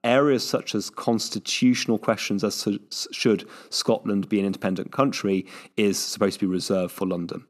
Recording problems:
none

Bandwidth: 13.5 kHz